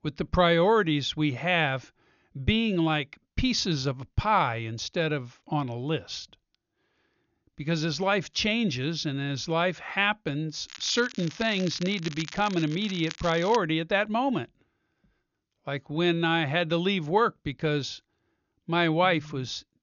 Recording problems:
high frequencies cut off; noticeable; nothing above 6.5 kHz
crackling; noticeable; from 11 to 14 s; 15 dB below the speech

